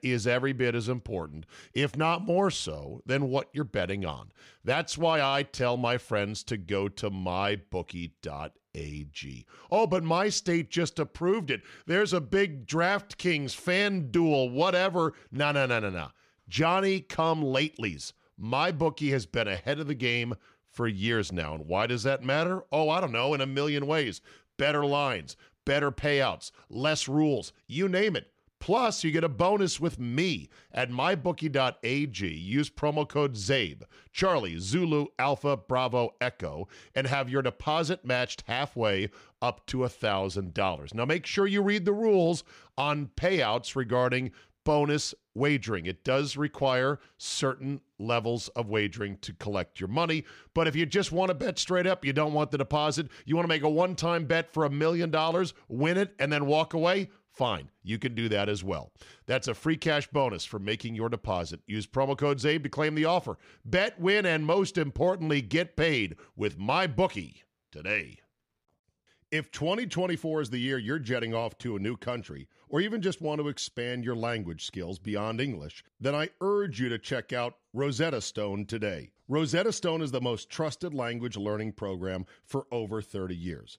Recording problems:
none

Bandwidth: 15 kHz